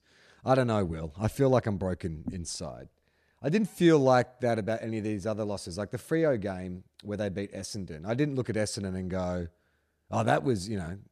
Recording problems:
none

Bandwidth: 14 kHz